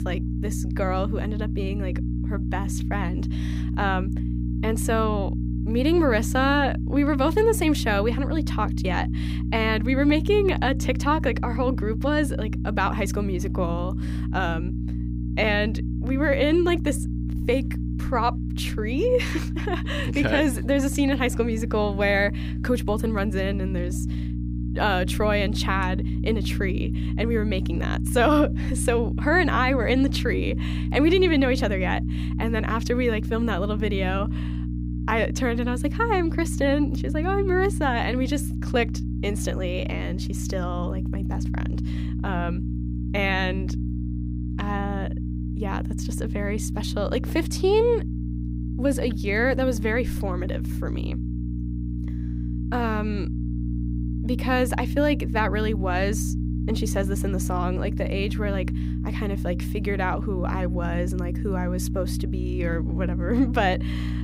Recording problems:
electrical hum; noticeable; throughout; 60 Hz, 10 dB below the speech

